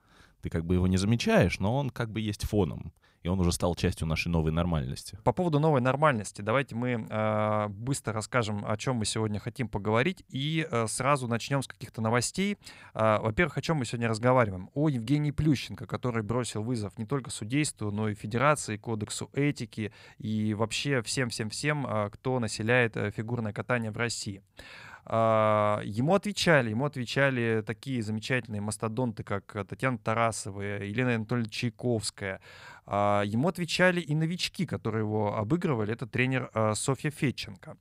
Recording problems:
none

